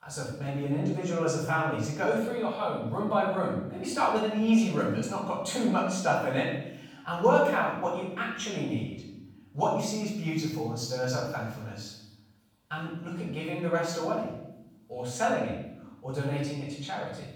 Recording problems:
off-mic speech; far
room echo; noticeable; dies away in 0.8 s

